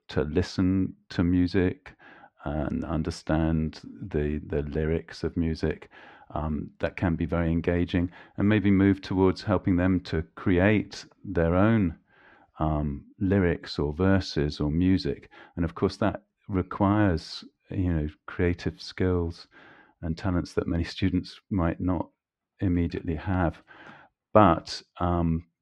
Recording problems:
muffled; slightly; fading above 2.5 kHz

